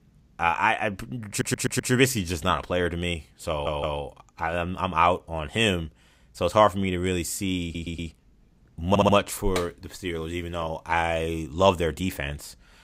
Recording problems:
audio stuttering; 4 times, first at 1.5 s

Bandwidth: 15.5 kHz